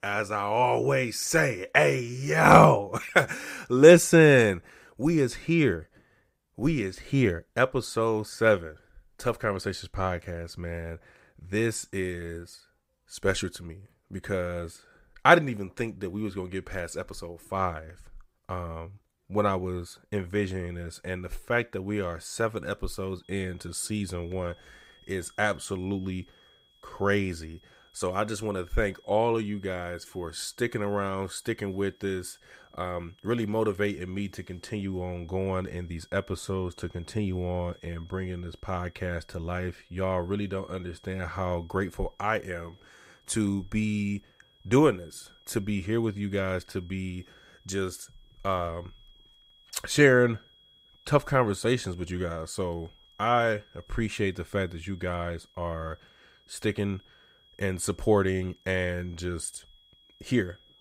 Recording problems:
high-pitched whine; faint; from 23 s on; 3.5 kHz, 30 dB below the speech

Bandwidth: 15.5 kHz